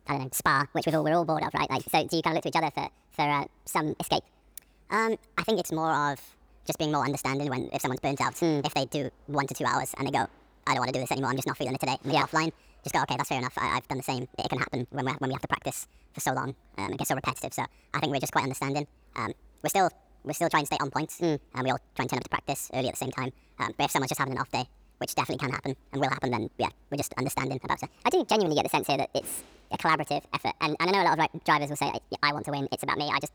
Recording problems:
wrong speed and pitch; too fast and too high; 1.6 times normal speed

